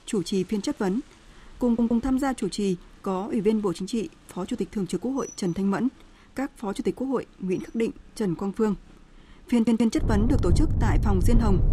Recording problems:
rain or running water; very loud; throughout; as loud as the speech
audio stuttering; at 1.5 s and at 9.5 s

